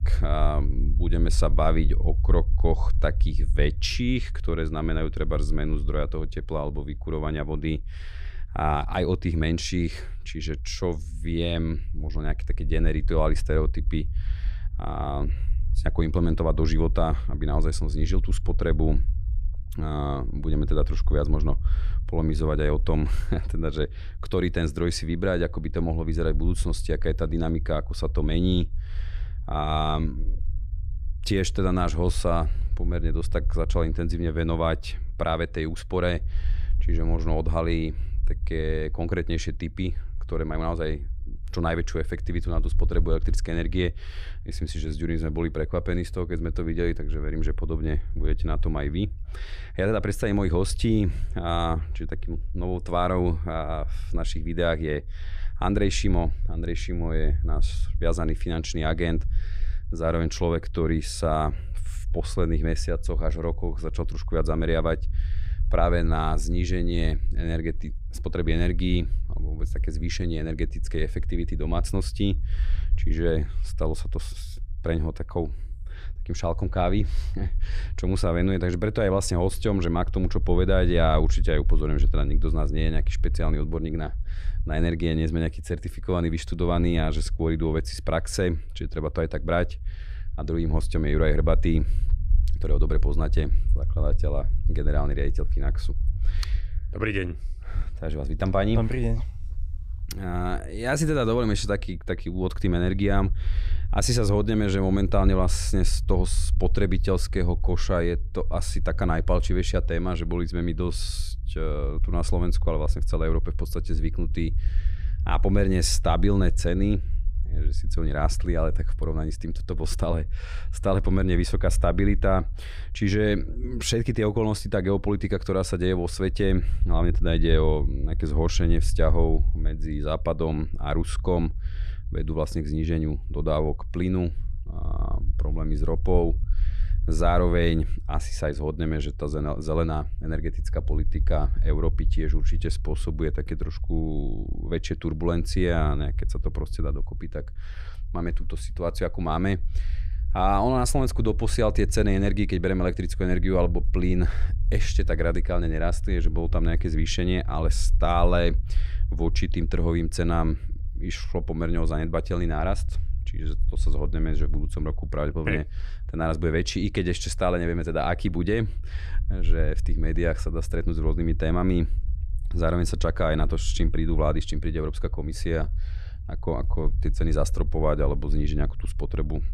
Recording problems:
low rumble; faint; throughout; 20 dB below the speech

